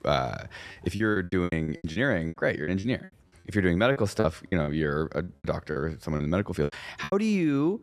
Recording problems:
choppy; very; 16% of the speech affected

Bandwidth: 14 kHz